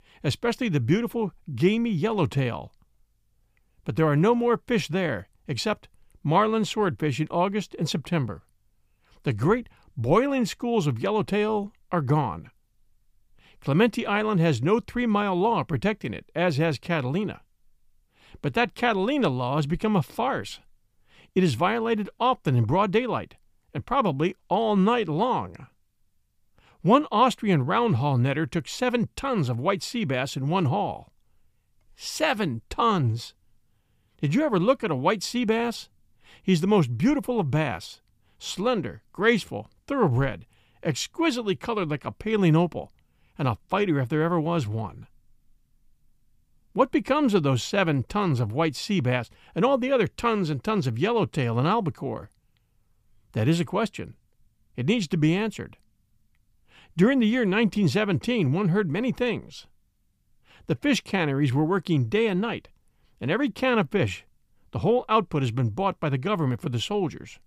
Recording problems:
none

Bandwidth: 15 kHz